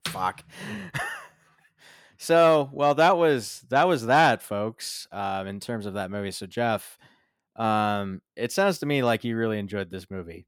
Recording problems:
none

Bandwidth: 17 kHz